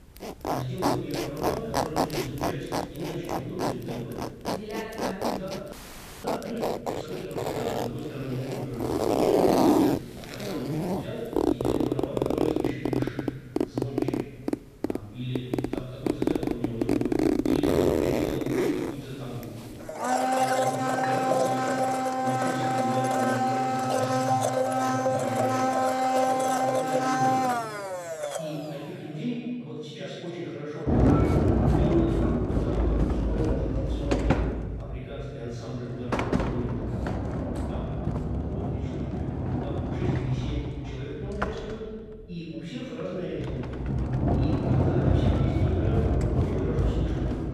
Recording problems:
room echo; strong; dies away in 1.7 s
off-mic speech; far
household noises; very loud; throughout; 9 dB above the speech
audio freezing; at 5.5 s for 0.5 s

